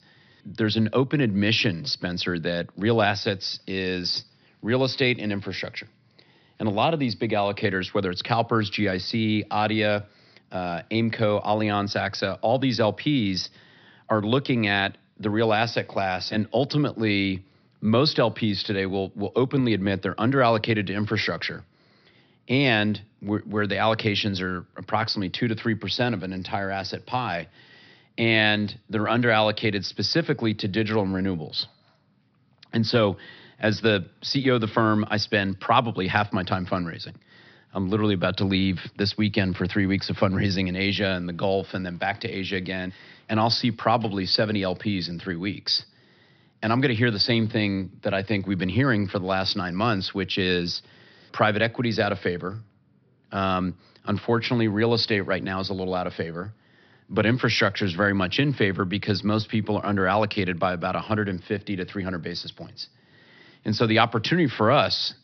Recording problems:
high frequencies cut off; noticeable; nothing above 5.5 kHz

